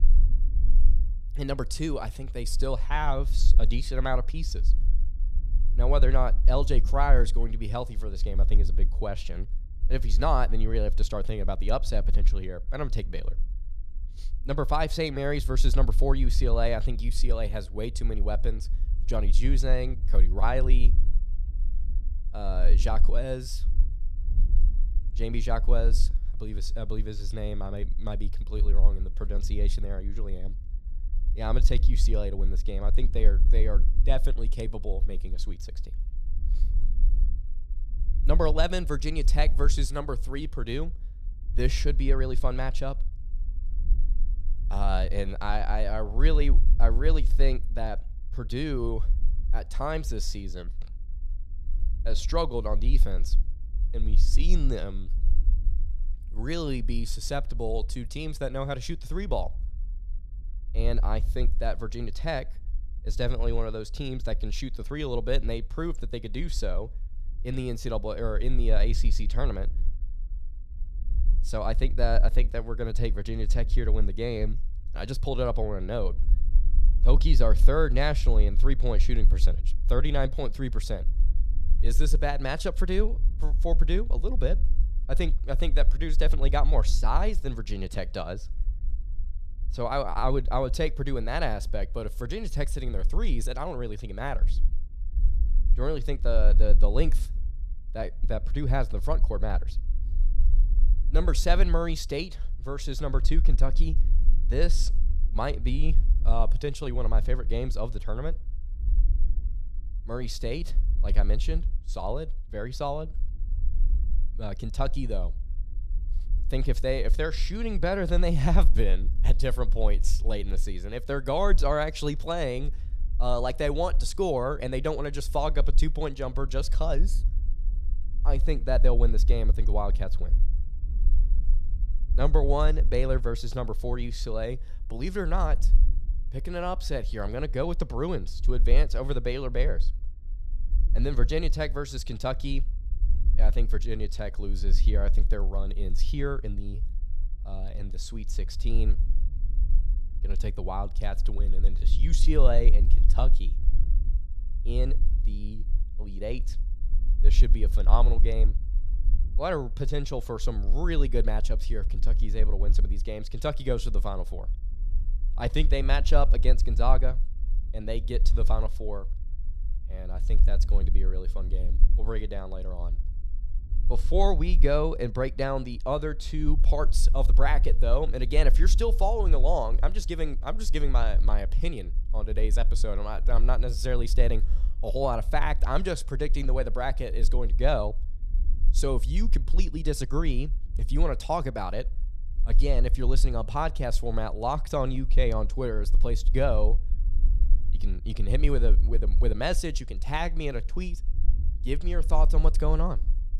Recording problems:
low rumble; faint; throughout; 20 dB below the speech

